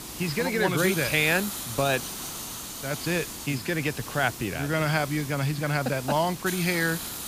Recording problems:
high frequencies cut off; noticeable; nothing above 5.5 kHz
hiss; loud; throughout; 8 dB below the speech

